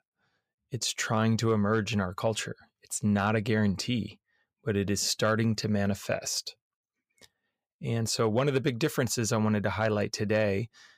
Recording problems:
none

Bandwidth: 15.5 kHz